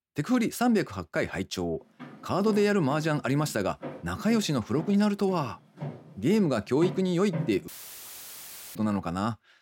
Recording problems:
footsteps; noticeable; from 2 to 9 s; peak 7 dB below the speech
audio cutting out; filled with static; at 7.5 s for 1 s

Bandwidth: 16.5 kHz